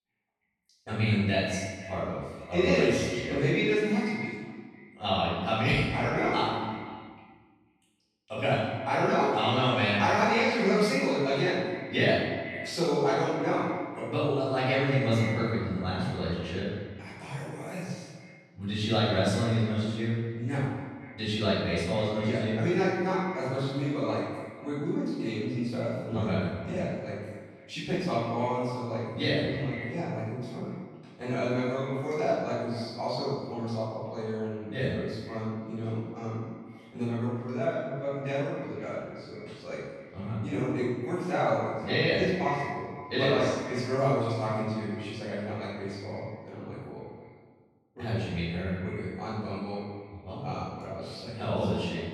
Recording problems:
room echo; strong; dies away in 1.1 s
off-mic speech; far
echo of what is said; noticeable; throughout; 240 ms later, 15 dB below the speech

